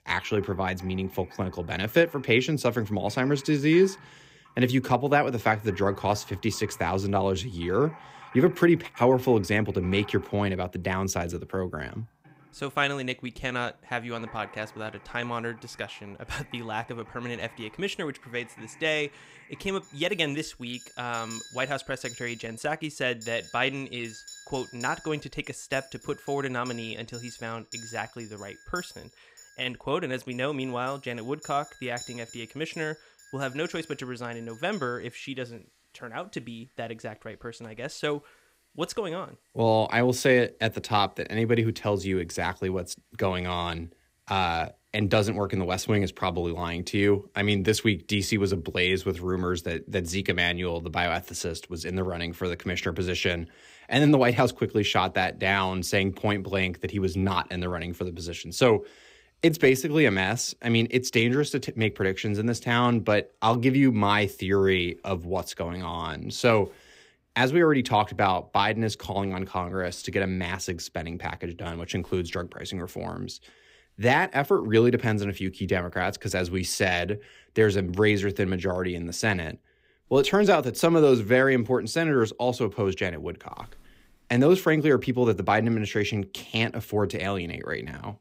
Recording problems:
household noises; faint; throughout; 20 dB below the speech

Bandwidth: 15.5 kHz